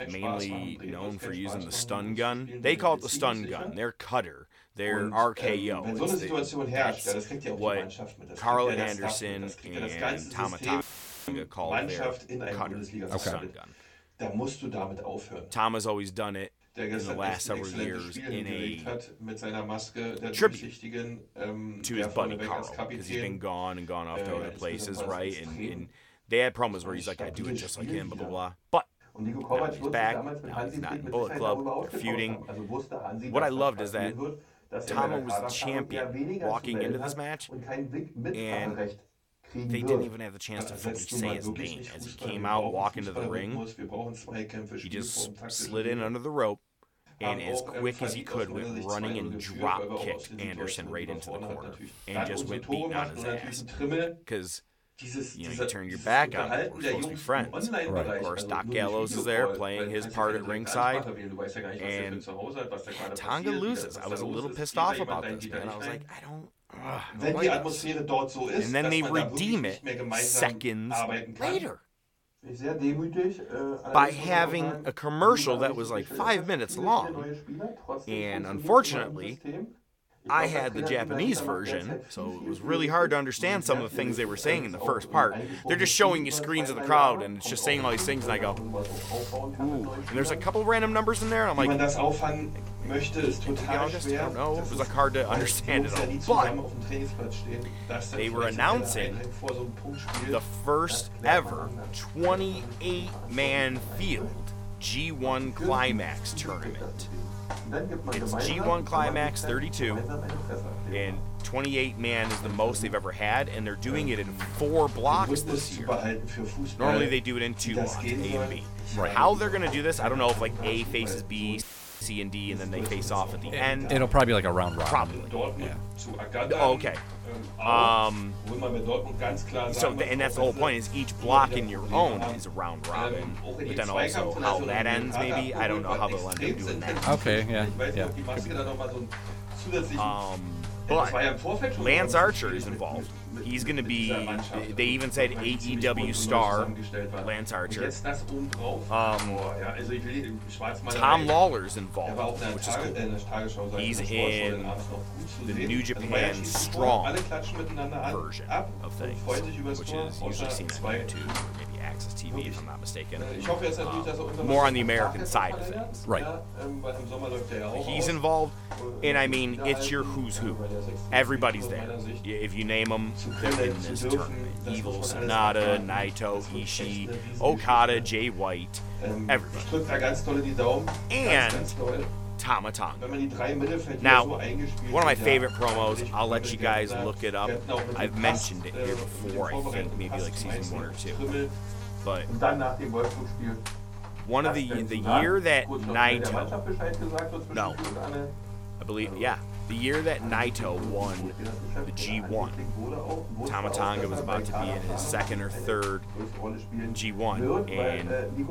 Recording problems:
voice in the background; loud; throughout; 6 dB below the speech
electrical hum; noticeable; from 1:28 on; 50 Hz, 15 dB below the speech
audio cutting out; filled with static; at 11 s and at 2:02

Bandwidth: 17 kHz